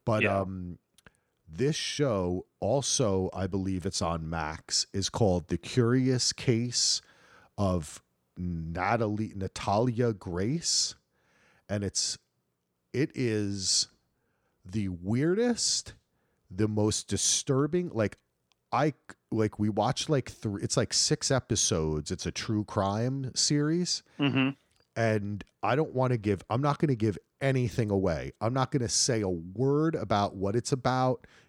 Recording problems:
none

